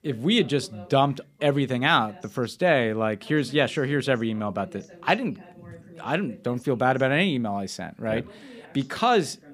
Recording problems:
voice in the background; faint; throughout; 25 dB below the speech

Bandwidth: 15 kHz